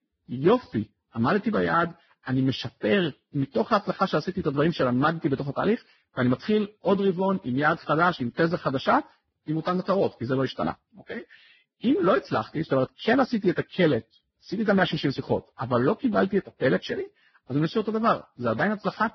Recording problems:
garbled, watery; badly; nothing above 5.5 kHz

